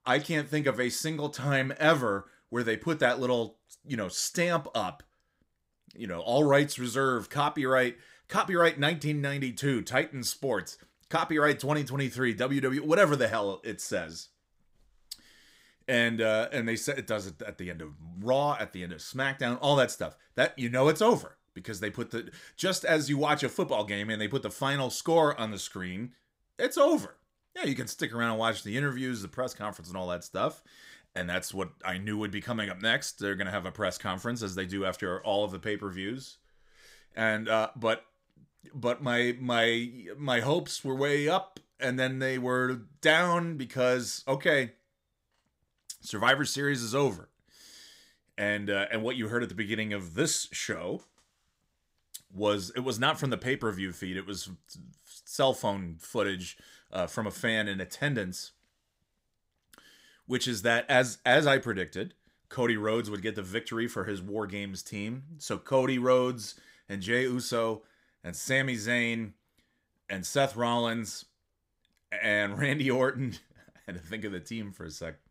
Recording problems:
none

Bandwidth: 15.5 kHz